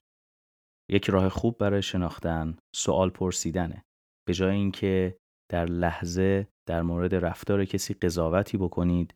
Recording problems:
none

